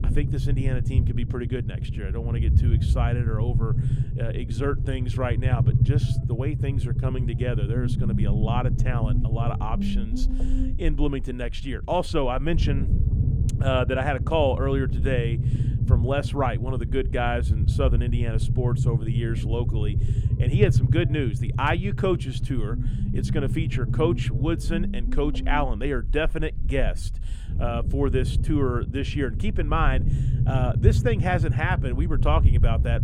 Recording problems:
low rumble; loud; throughout; 8 dB below the speech

